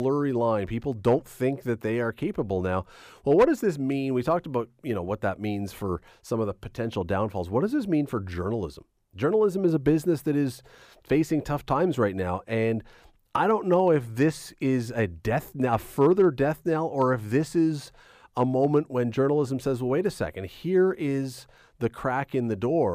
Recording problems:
abrupt cut into speech; at the start and the end

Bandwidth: 15 kHz